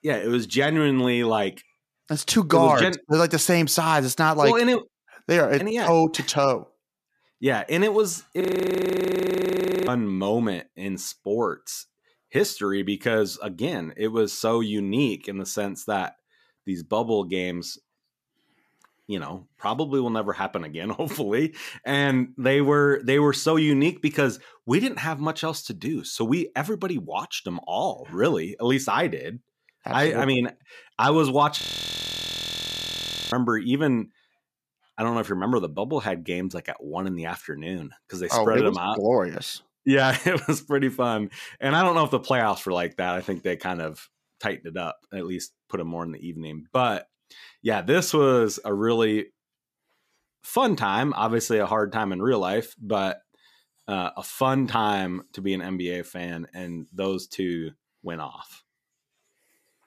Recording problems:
audio freezing; at 8.5 s for 1.5 s and at 32 s for 1.5 s

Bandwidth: 14.5 kHz